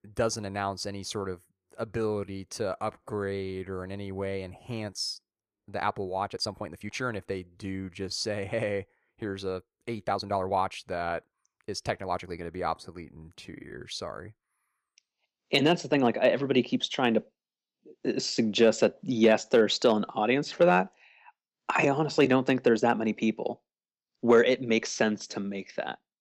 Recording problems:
uneven, jittery; strongly; from 2 to 25 s

